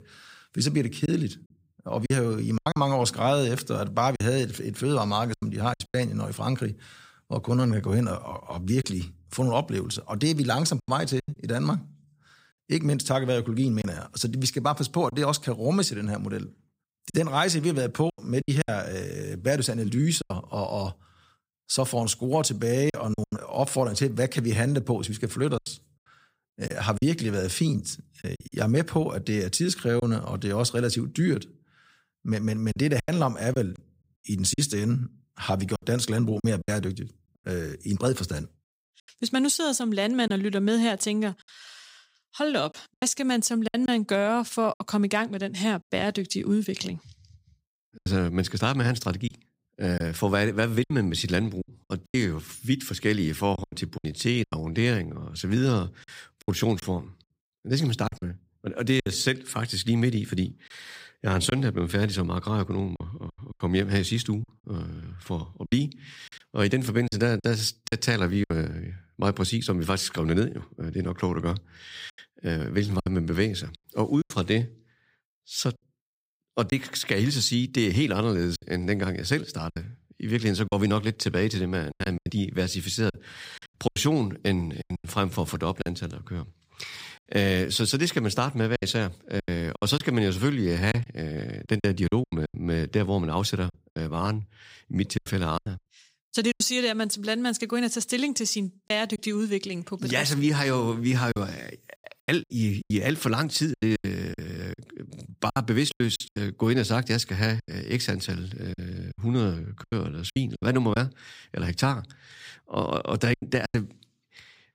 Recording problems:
choppy; very; 7% of the speech affected

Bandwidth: 15.5 kHz